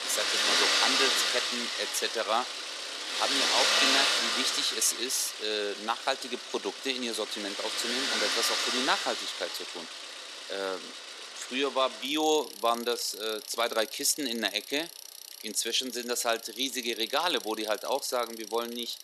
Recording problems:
thin; somewhat; fading below 350 Hz
traffic noise; very loud; throughout; 2 dB above the speech

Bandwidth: 13.5 kHz